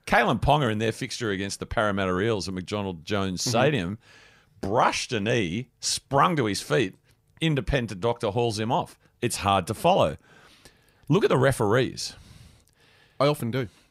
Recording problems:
none

